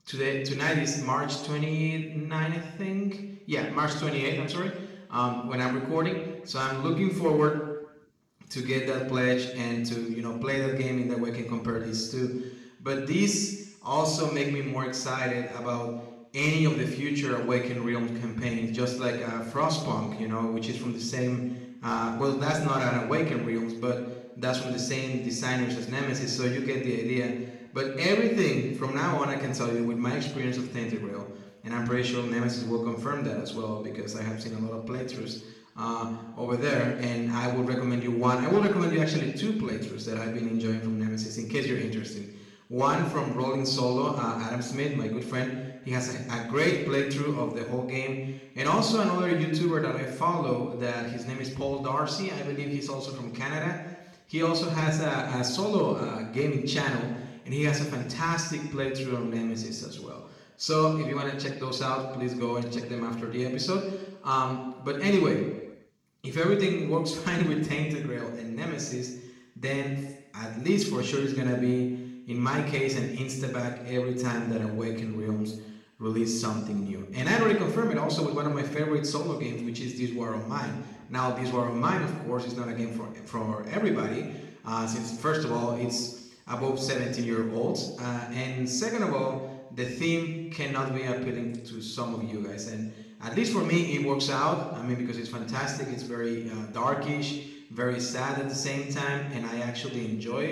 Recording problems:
off-mic speech; far
room echo; noticeable; dies away in 0.9 s
abrupt cut into speech; at the end

